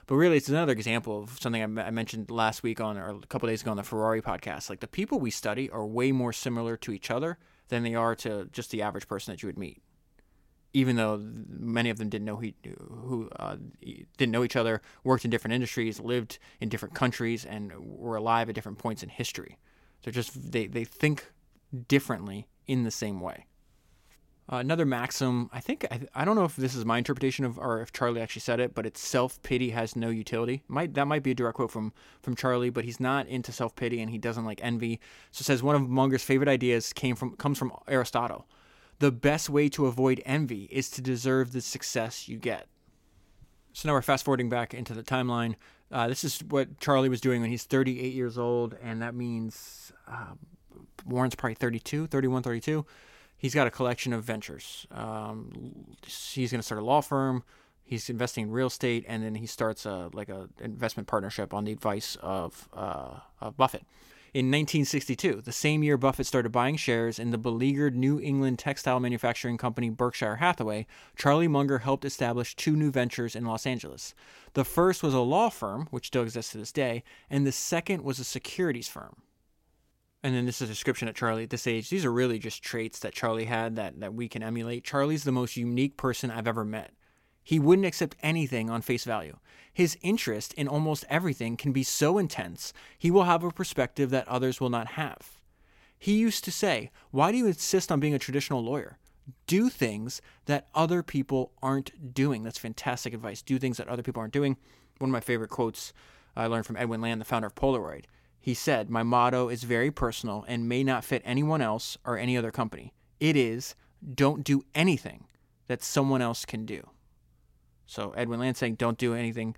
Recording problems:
none

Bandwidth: 16.5 kHz